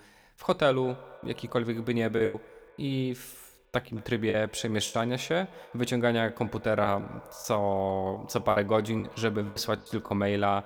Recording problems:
echo of what is said; faint; throughout; 210 ms later, 20 dB below the speech
choppy; very; 7% of the speech affected

